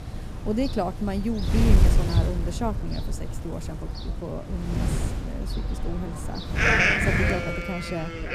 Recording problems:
animal sounds; very loud; throughout; 3 dB above the speech
wind noise on the microphone; heavy; 4 dB below the speech

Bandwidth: 14.5 kHz